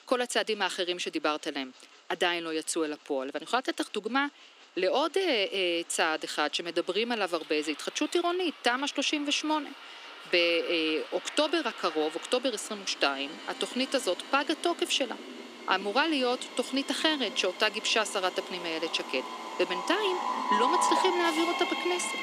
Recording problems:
thin; somewhat; fading below 250 Hz
train or aircraft noise; loud; throughout; 7 dB below the speech

